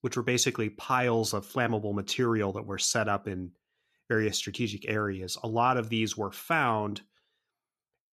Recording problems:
none

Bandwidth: 14.5 kHz